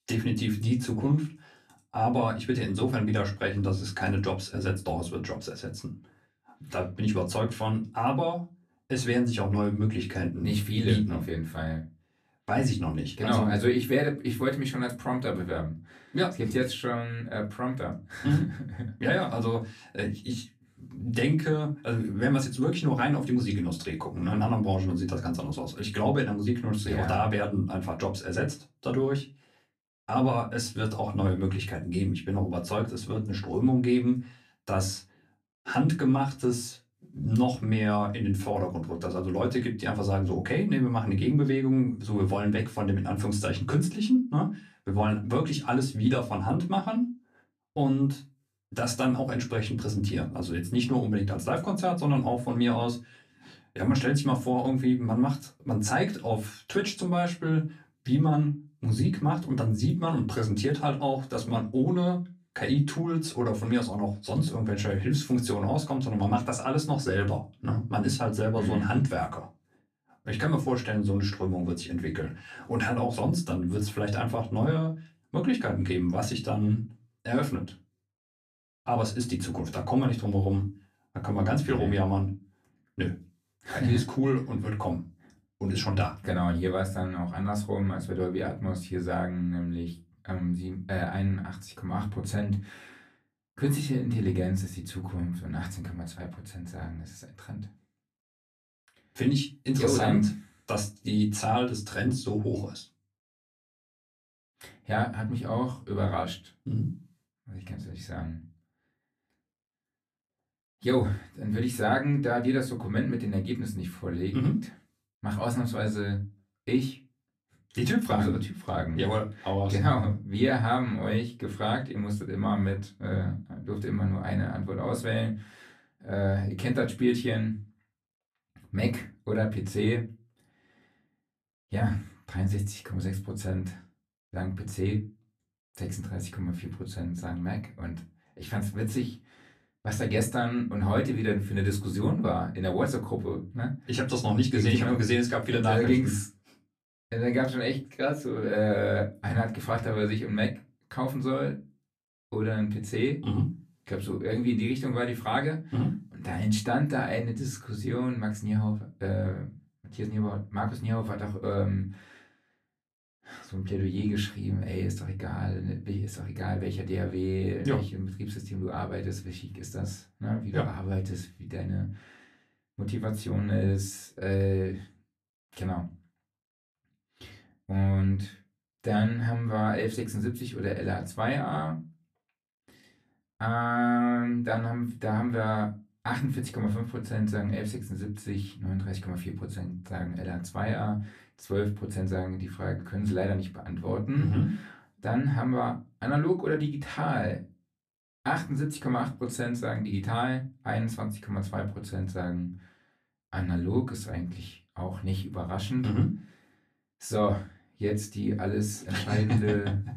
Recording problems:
off-mic speech; far
room echo; very slight; dies away in 0.2 s

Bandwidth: 14.5 kHz